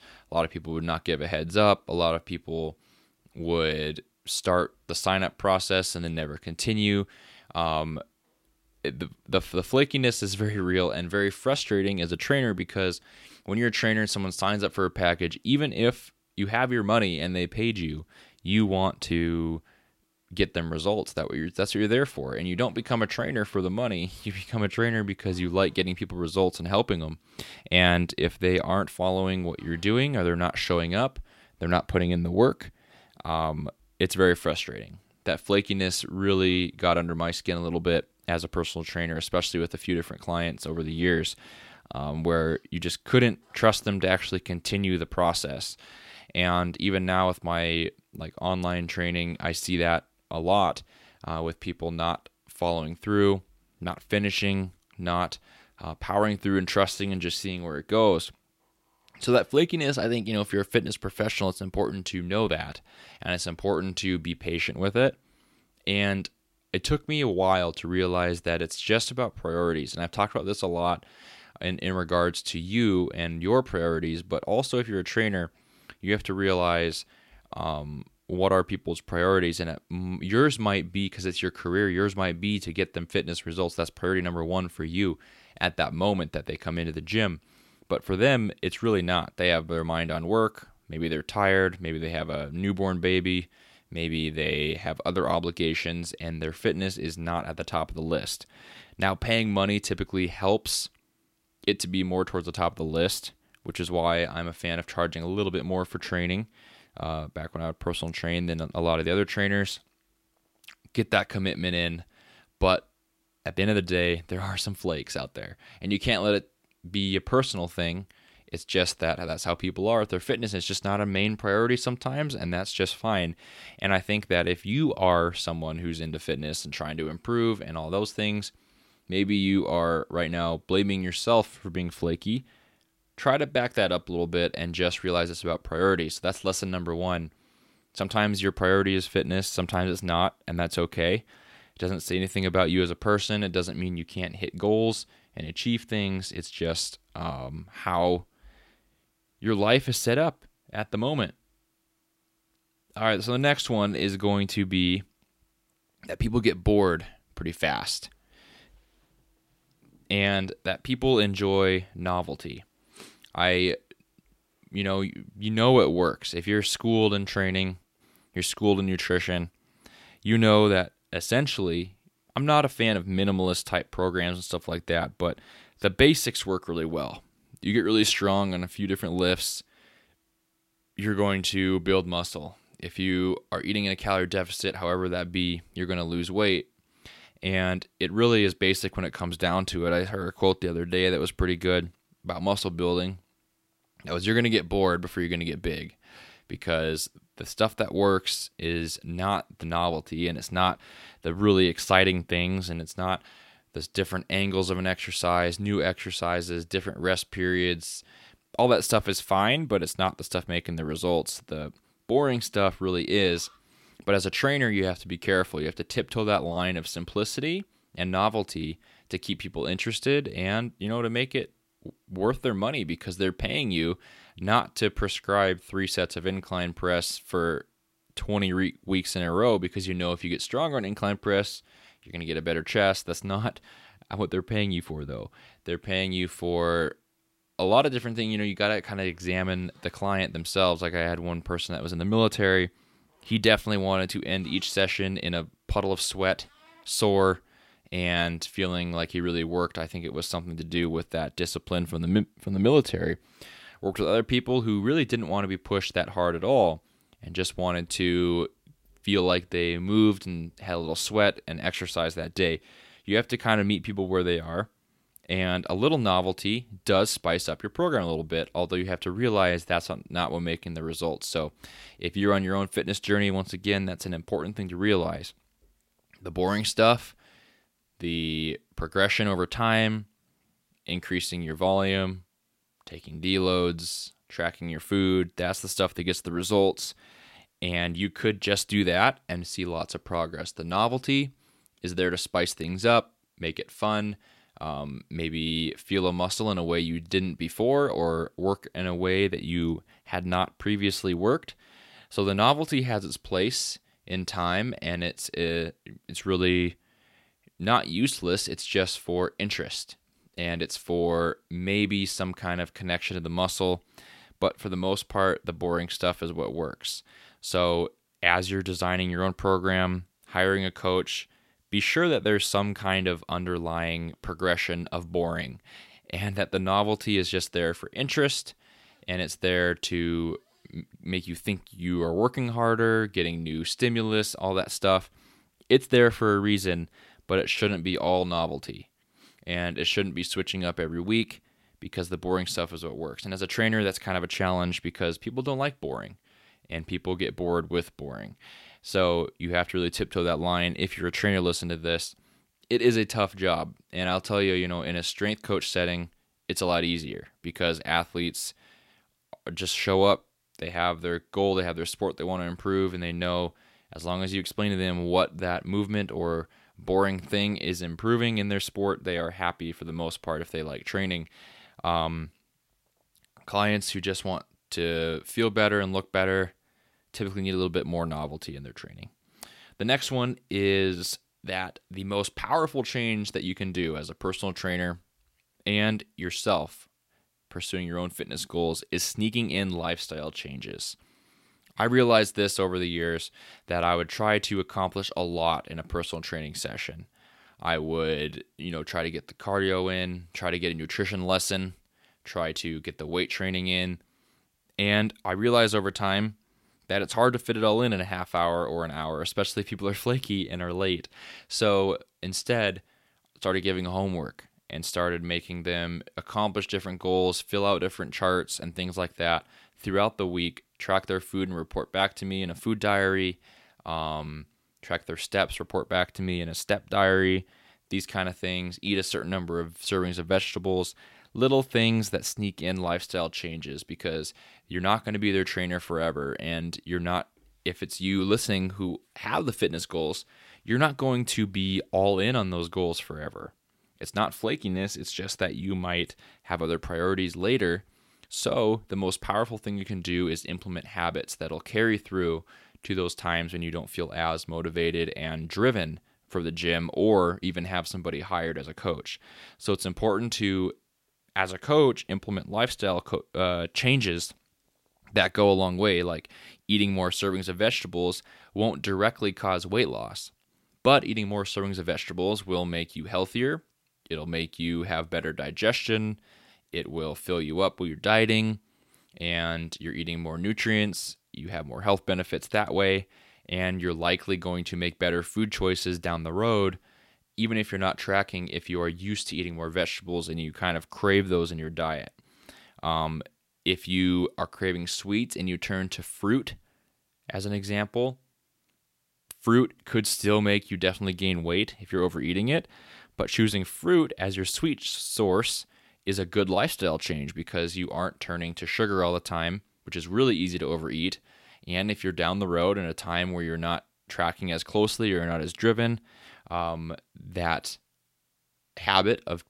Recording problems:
none

